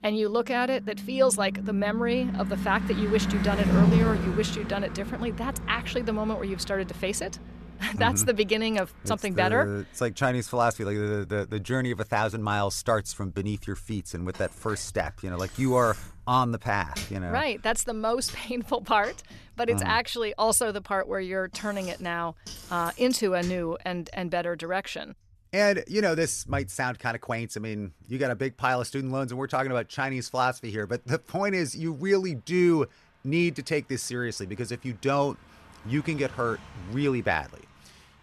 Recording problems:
traffic noise; loud; throughout; 4 dB below the speech

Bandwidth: 13.5 kHz